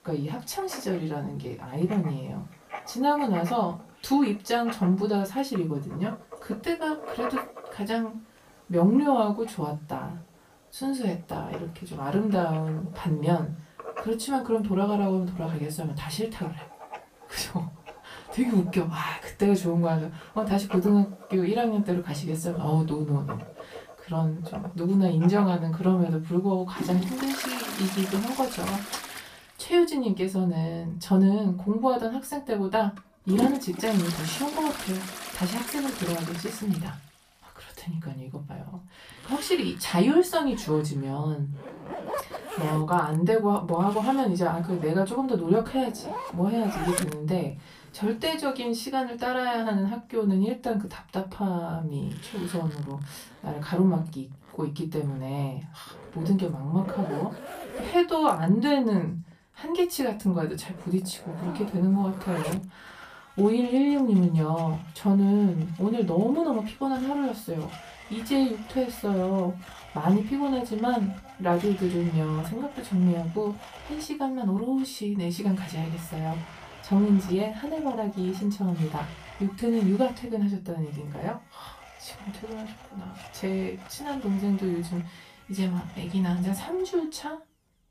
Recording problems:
off-mic speech; far
room echo; very slight; dies away in 0.2 s
household noises; noticeable; throughout; 15 dB below the speech

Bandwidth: 15 kHz